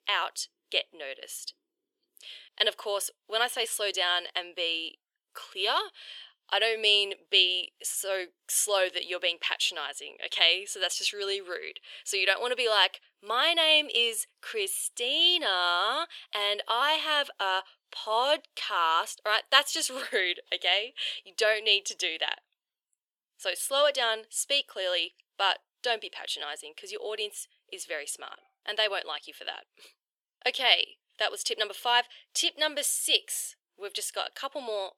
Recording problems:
thin; very; fading below 450 Hz

